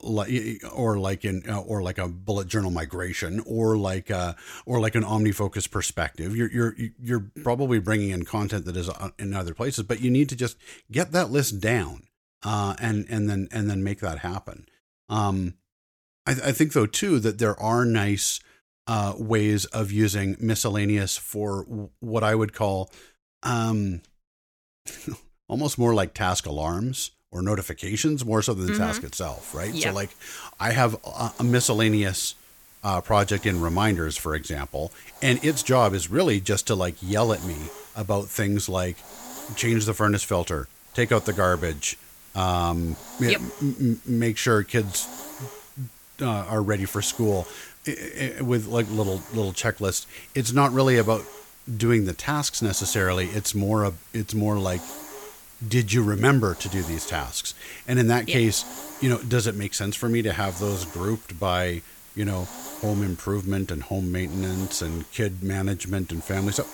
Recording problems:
hiss; noticeable; from 29 s on; 15 dB below the speech

